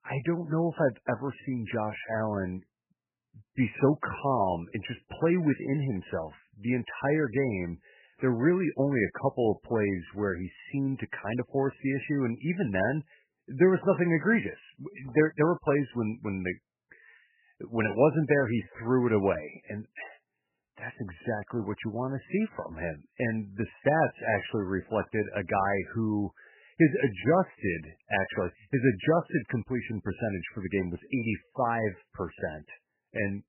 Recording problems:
garbled, watery; badly; nothing above 3 kHz

